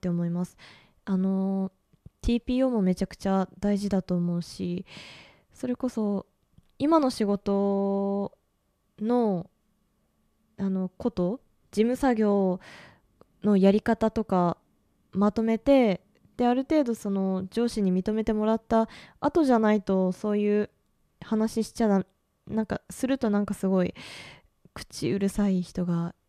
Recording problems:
none

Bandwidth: 14.5 kHz